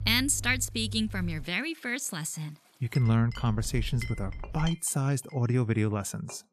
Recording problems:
household noises; noticeable; throughout; 15 dB below the speech
low rumble; faint; until 1.5 s and from 3 to 4.5 s; 25 dB below the speech

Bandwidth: 13.5 kHz